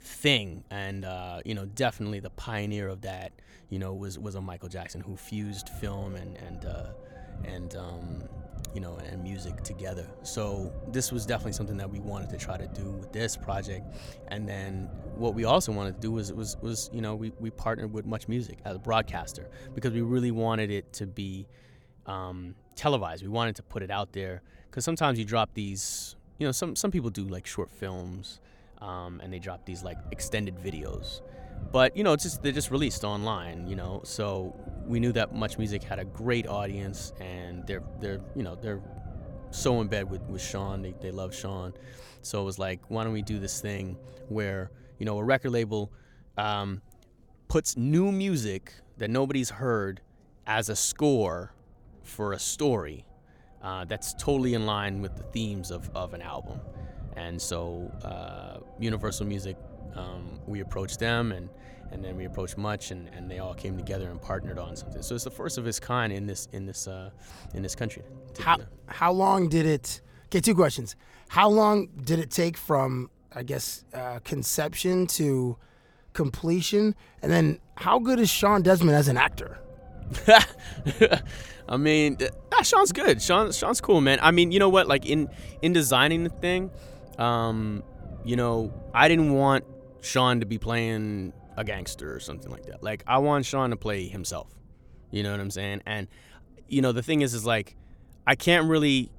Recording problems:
low rumble; faint; throughout; 25 dB below the speech

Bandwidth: 18 kHz